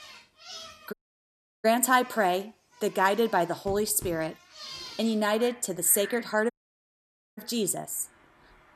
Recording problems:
animal sounds; noticeable; throughout; 20 dB below the speech
audio cutting out; at 1 s for 0.5 s and at 6.5 s for 1 s

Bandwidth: 13.5 kHz